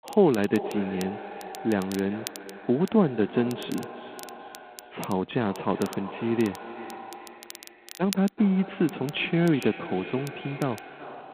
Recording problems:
phone-call audio; poor line; nothing above 3.5 kHz
echo of what is said; noticeable; throughout; 380 ms later, 15 dB below the speech
crackle, like an old record; noticeable; 20 dB below the speech

